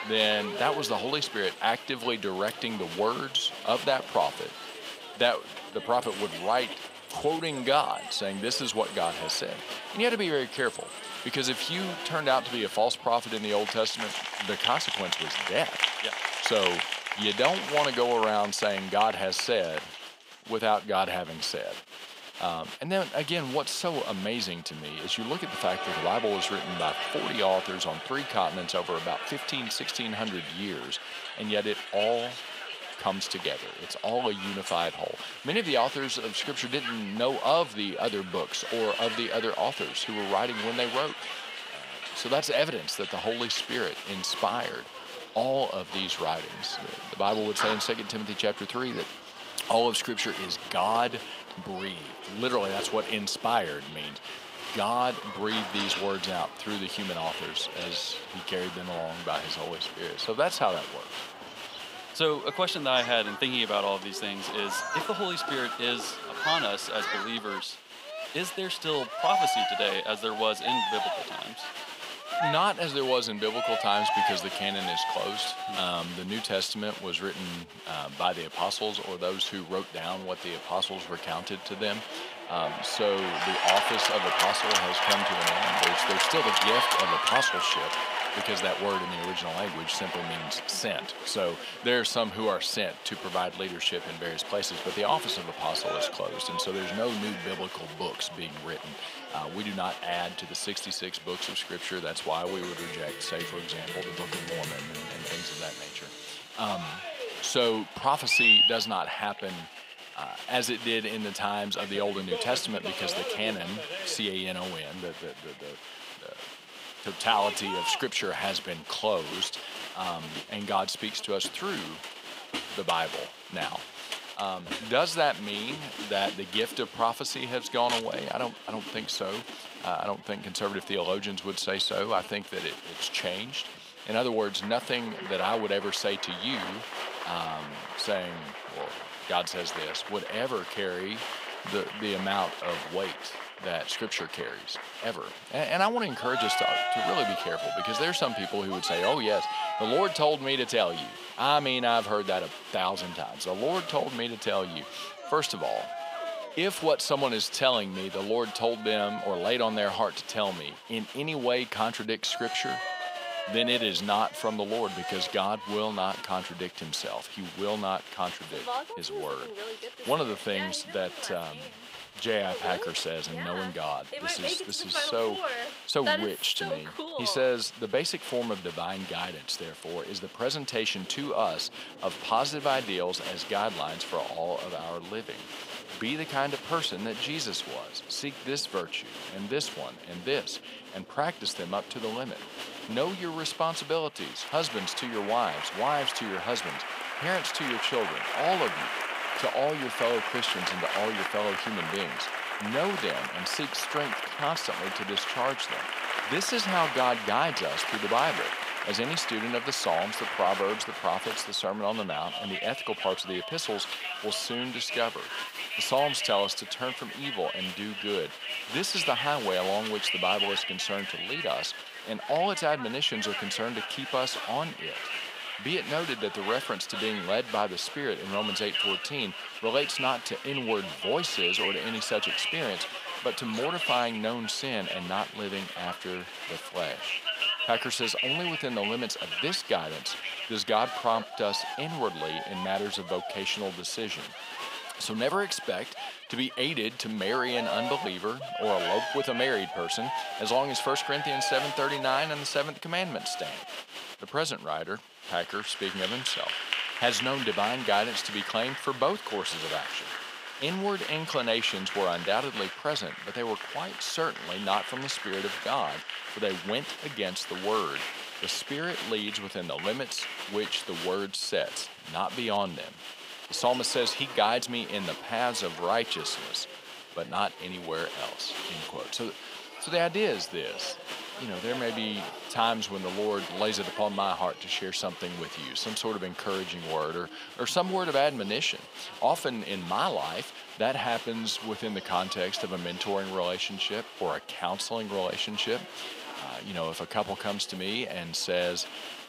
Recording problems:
thin; somewhat; fading below 300 Hz
crowd noise; loud; throughout; 4 dB below the speech

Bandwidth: 15.5 kHz